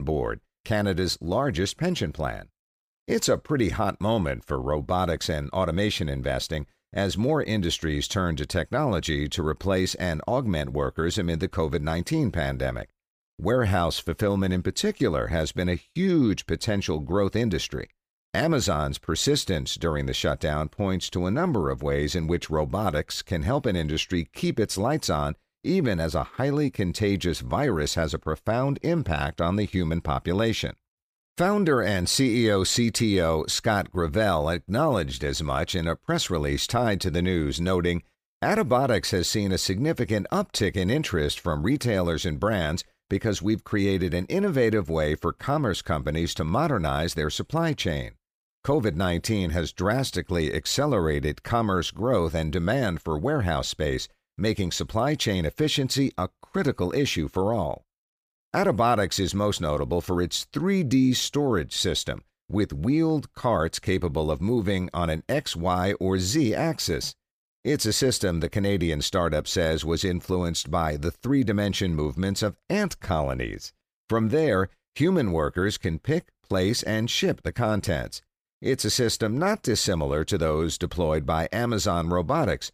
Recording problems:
abrupt cut into speech; at the start

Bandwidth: 15 kHz